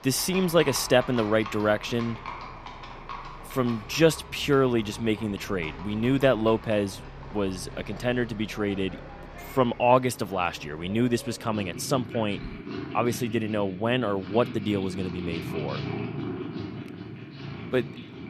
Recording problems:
animal sounds; noticeable; throughout; 10 dB below the speech

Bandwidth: 14.5 kHz